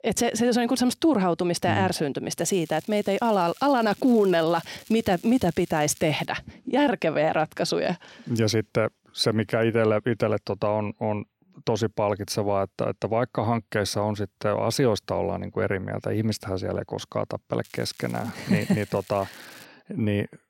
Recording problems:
crackling; faint; from 2.5 to 4.5 s, from 4.5 to 6.5 s and from 18 to 20 s; 25 dB below the speech

